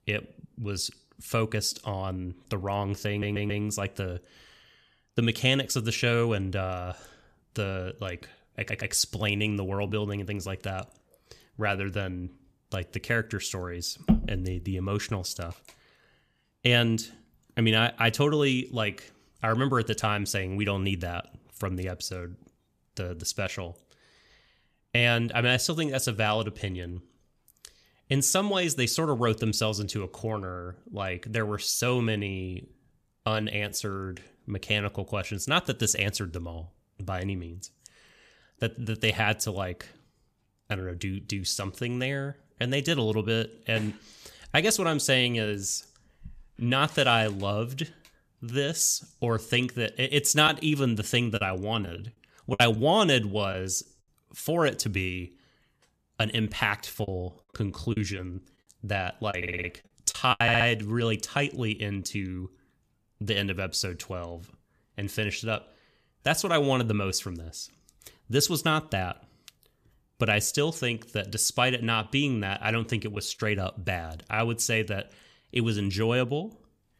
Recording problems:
audio stuttering; 4 times, first at 3 s
choppy; very; from 50 to 54 s and from 57 s to 1:00; 5% of the speech affected

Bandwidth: 14.5 kHz